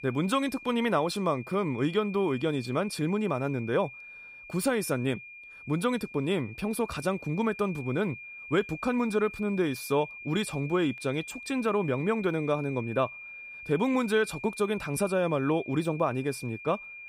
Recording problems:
high-pitched whine; noticeable; throughout; 2.5 kHz, 15 dB below the speech

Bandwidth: 15.5 kHz